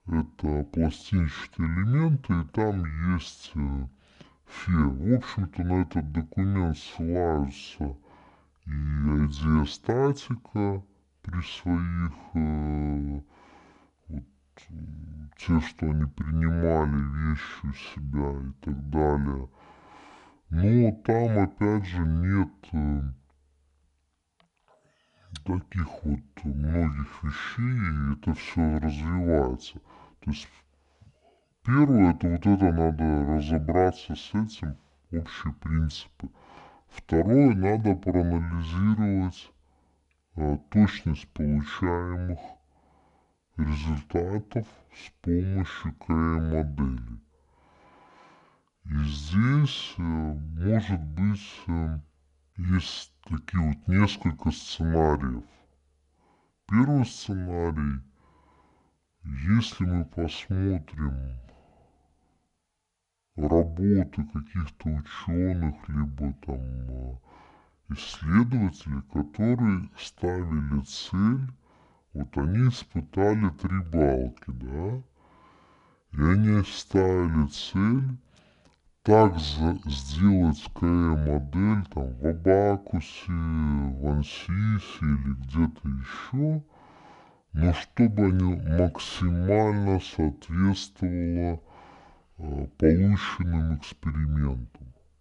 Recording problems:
wrong speed and pitch; too slow and too low; 0.6 times normal speed

